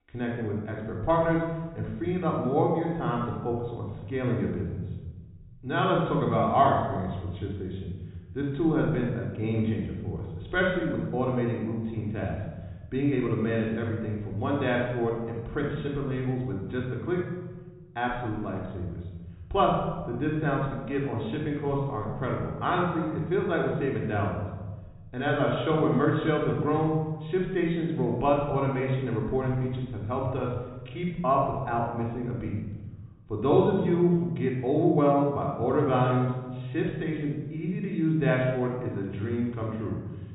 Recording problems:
off-mic speech; far
high frequencies cut off; severe; nothing above 4 kHz
room echo; noticeable; dies away in 1.3 s

